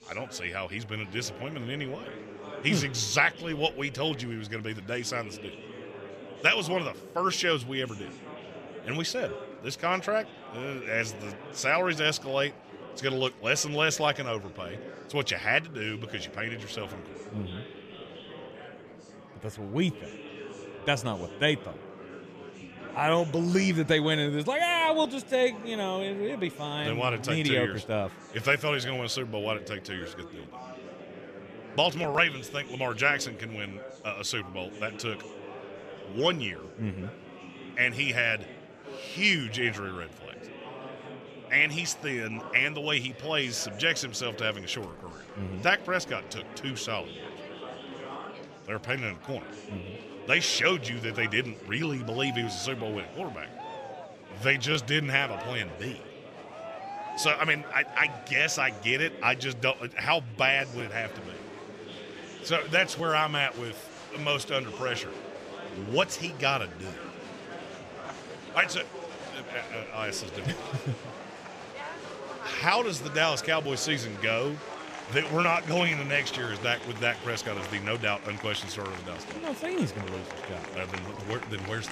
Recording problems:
chatter from many people; noticeable; throughout; 15 dB below the speech

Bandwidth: 14.5 kHz